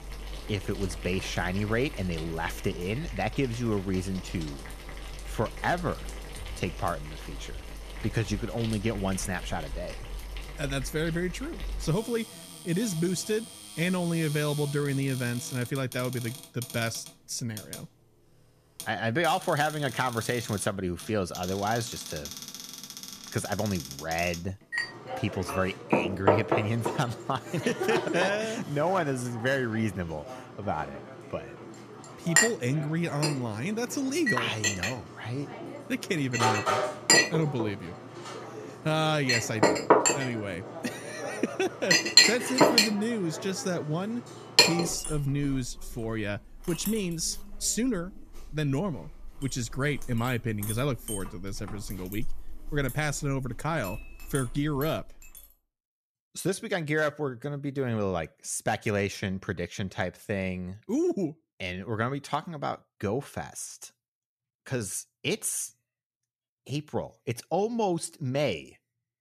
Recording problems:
household noises; very loud; until 55 s; 1 dB above the speech

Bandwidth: 14.5 kHz